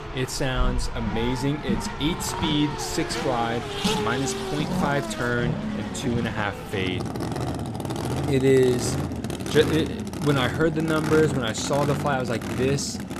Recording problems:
traffic noise; loud; throughout; 4 dB below the speech

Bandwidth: 14.5 kHz